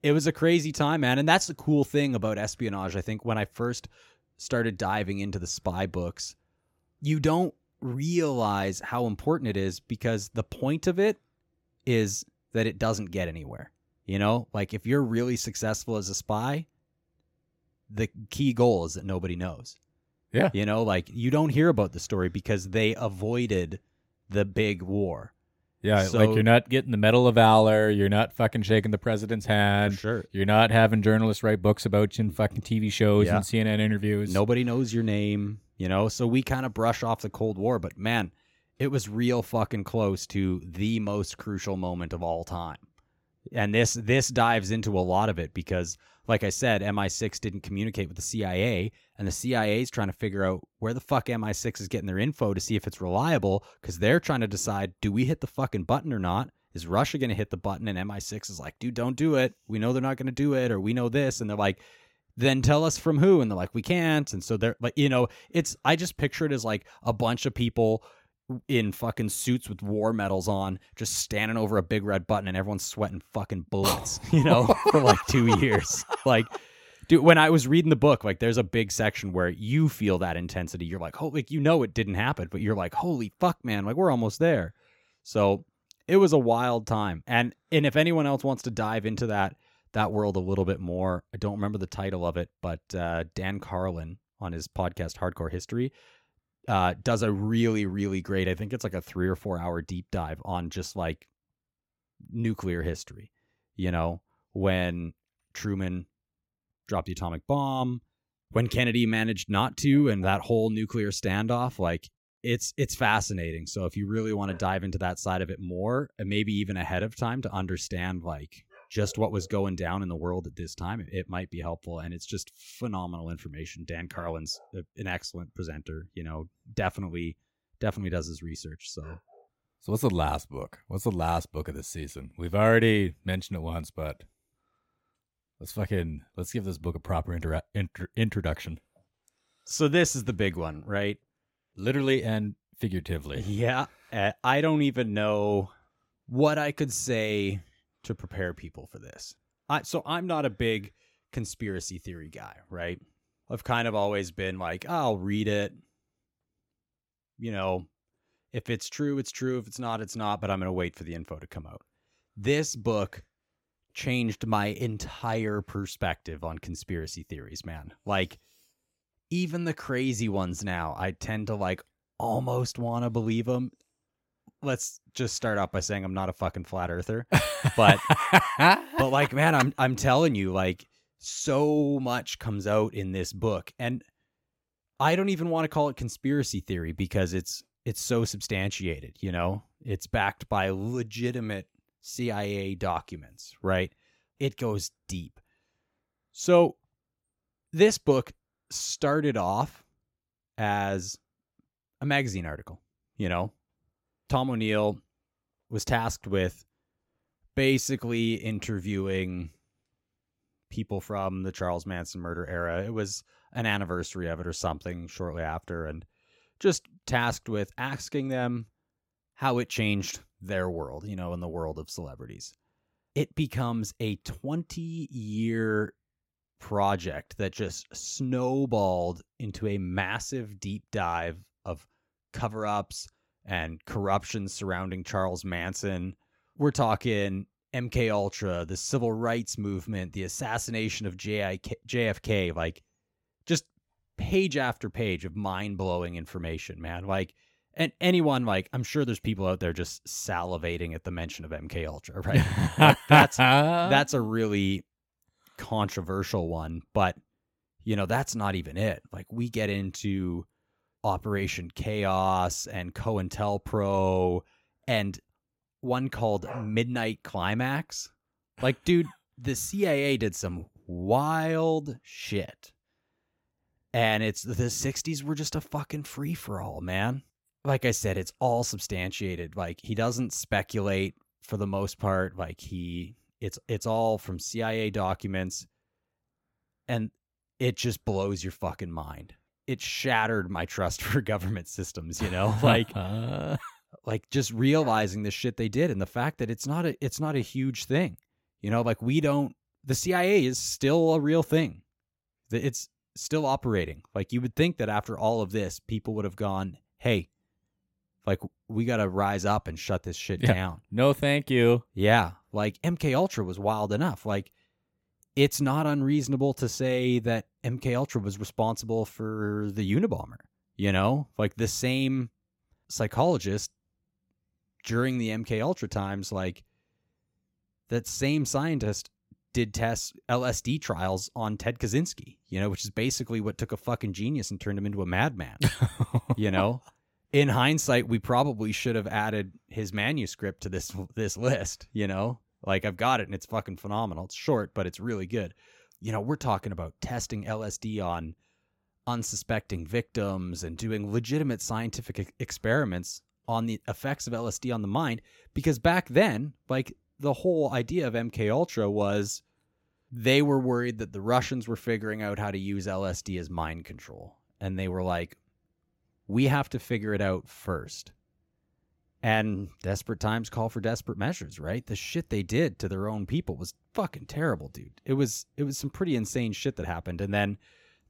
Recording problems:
none

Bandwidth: 16.5 kHz